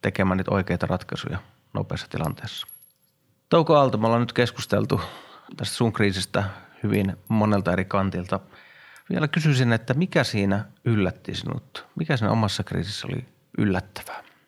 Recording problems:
household noises; faint; throughout; 25 dB below the speech

